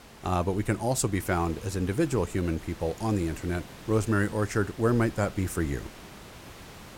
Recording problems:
hiss; noticeable; throughout; 20 dB below the speech

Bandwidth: 16.5 kHz